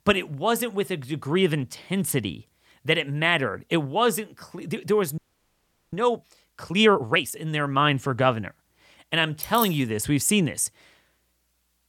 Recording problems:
audio freezing; at 5 s for 0.5 s
jangling keys; noticeable; at 9.5 s; peak 6 dB below the speech

